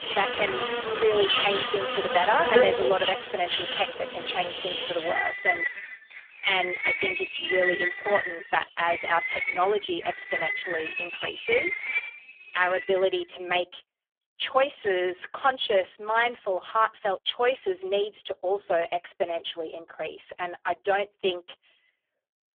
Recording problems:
phone-call audio; poor line; nothing above 3.5 kHz
animal sounds; loud; until 13 s; 2 dB below the speech

